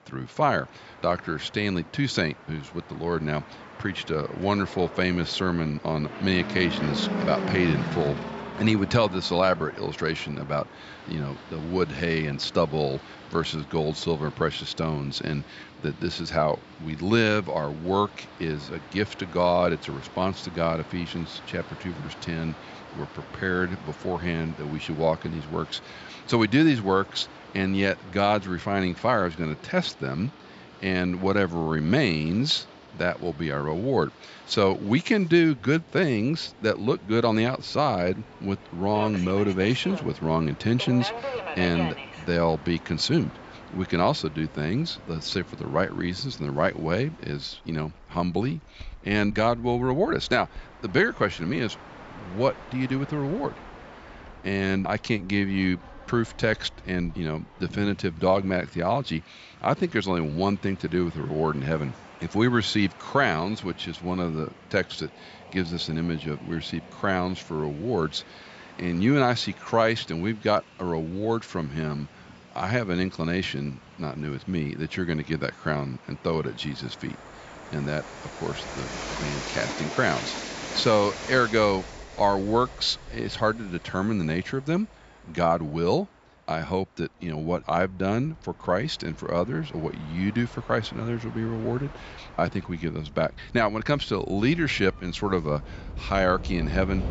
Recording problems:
high frequencies cut off; noticeable; nothing above 8 kHz
train or aircraft noise; noticeable; throughout; 15 dB below the speech

